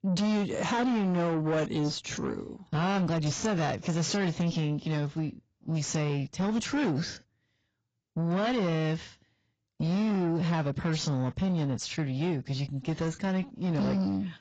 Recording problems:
garbled, watery; badly; nothing above 7.5 kHz
distortion; slight; 10 dB below the speech

